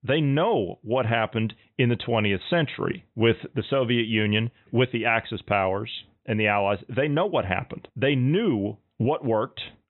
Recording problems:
high frequencies cut off; severe; nothing above 4 kHz

